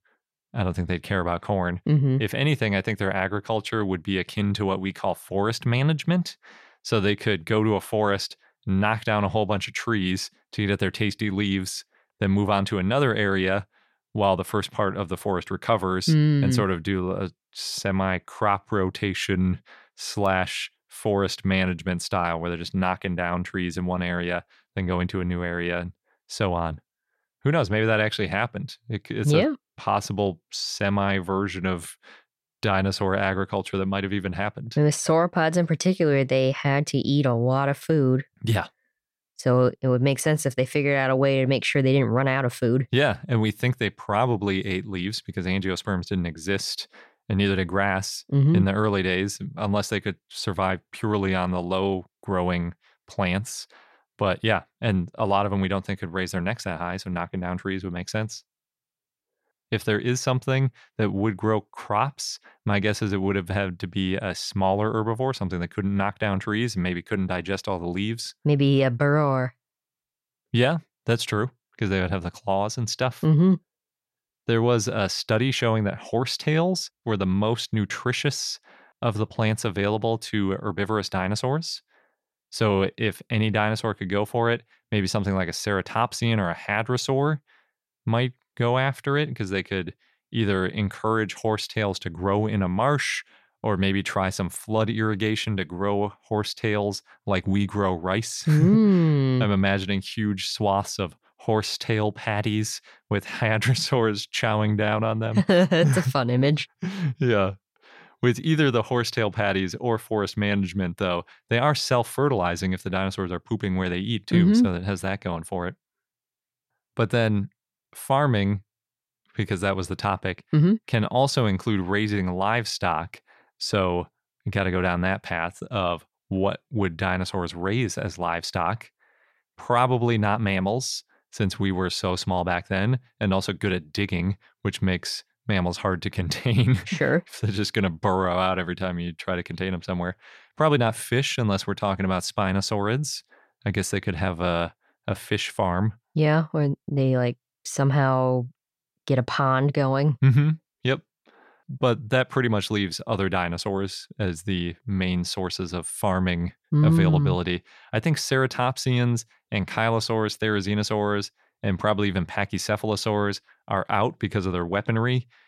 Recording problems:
none

